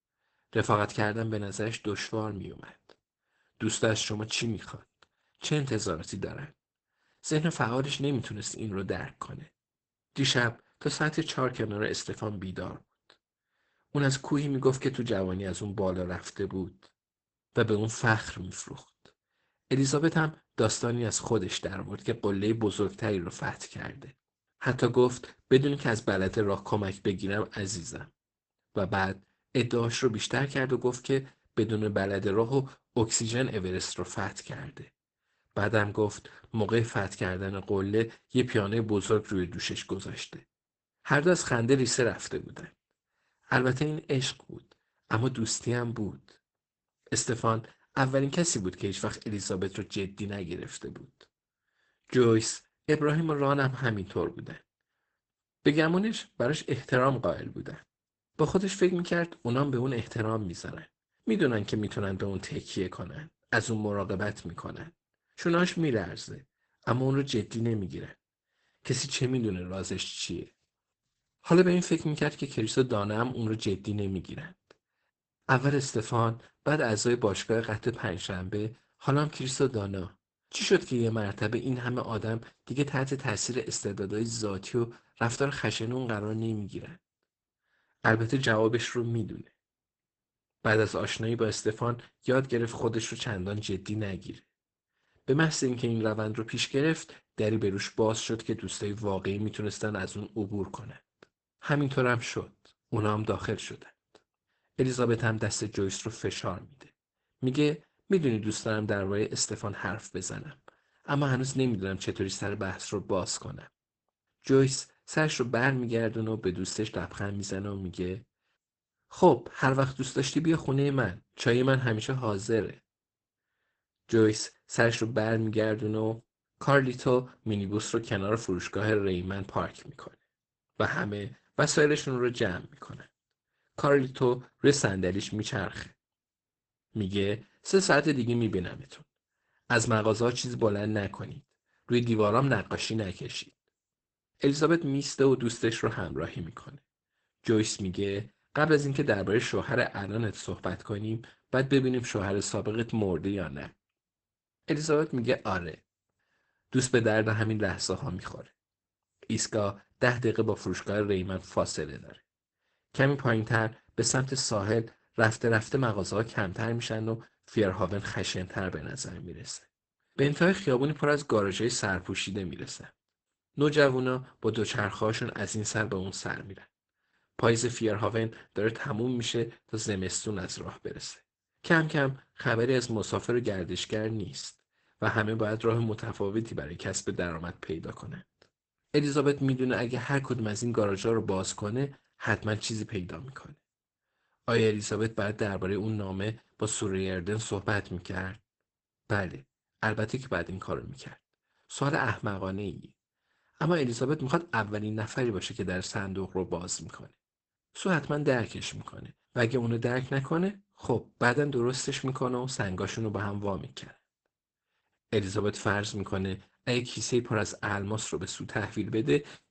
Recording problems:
garbled, watery; badly; nothing above 8 kHz

